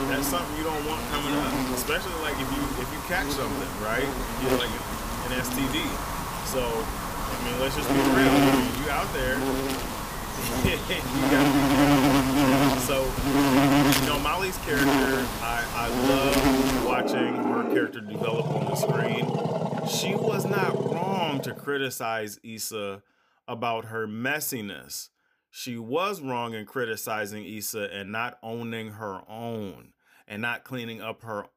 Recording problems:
animal sounds; very loud; until 22 s; 4 dB above the speech

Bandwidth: 15 kHz